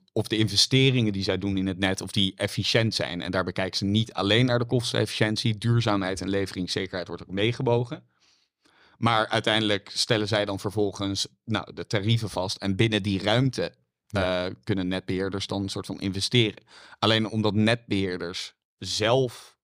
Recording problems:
none

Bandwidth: 15 kHz